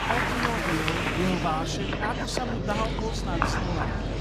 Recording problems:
animal sounds; very loud; throughout; 1 dB above the speech
murmuring crowd; very loud; throughout; 1 dB above the speech

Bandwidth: 14.5 kHz